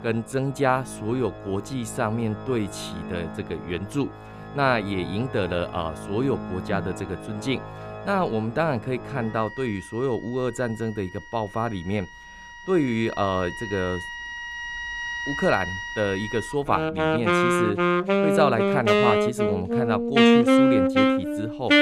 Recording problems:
background music; very loud; throughout; 3 dB above the speech

